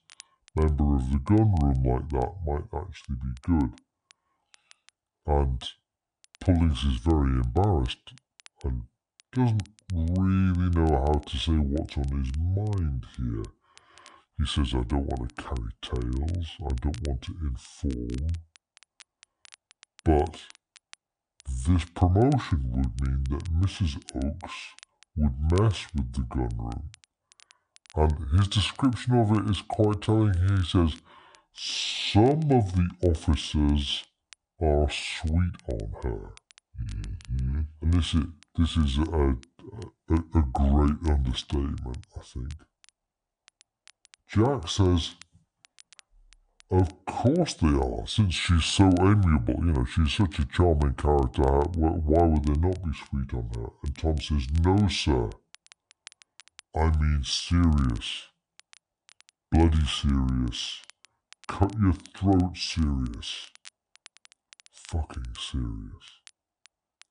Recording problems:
wrong speed and pitch; too slow and too low; 0.6 times normal speed
crackle, like an old record; faint; 30 dB below the speech

